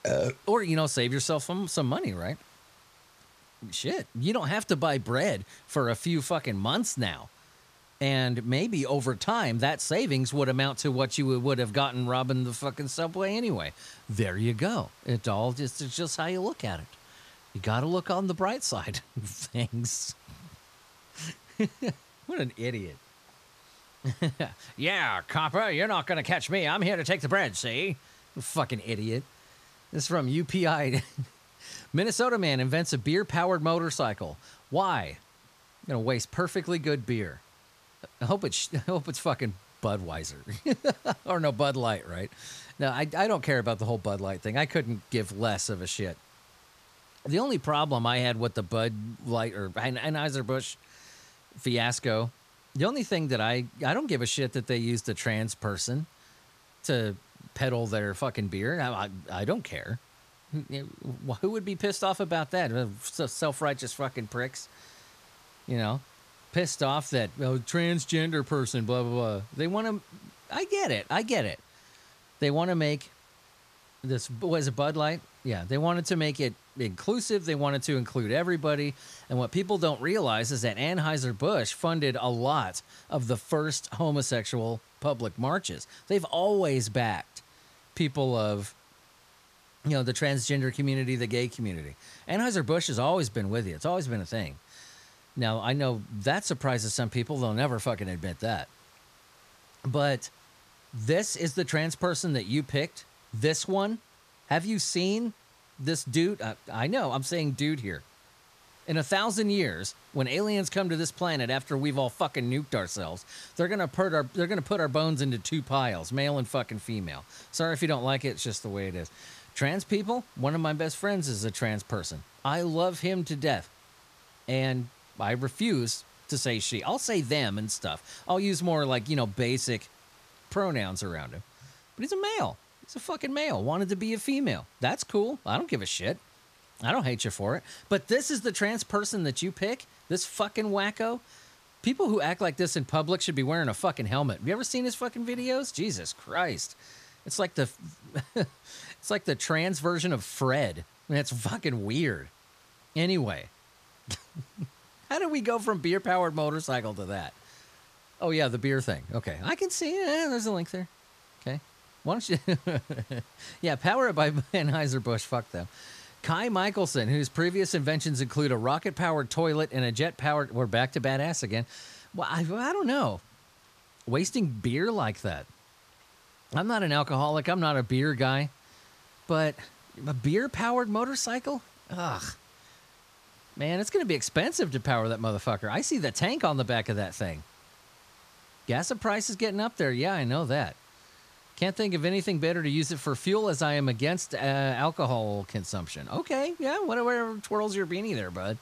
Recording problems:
hiss; faint; throughout; 25 dB below the speech

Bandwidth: 14.5 kHz